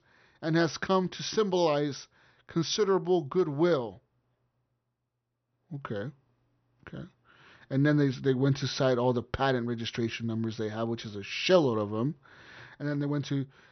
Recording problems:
high frequencies cut off; noticeable; nothing above 6 kHz

